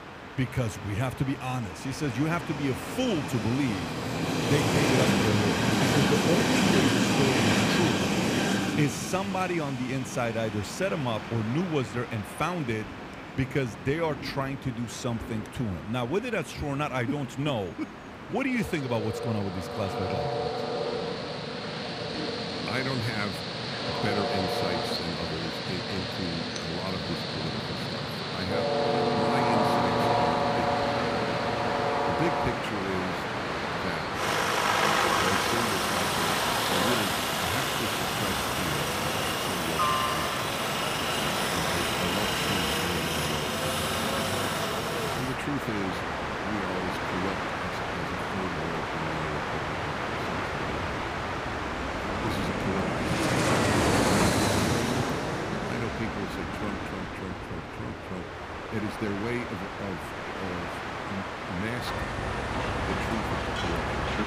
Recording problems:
train or aircraft noise; very loud; throughout; 5 dB above the speech

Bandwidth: 15 kHz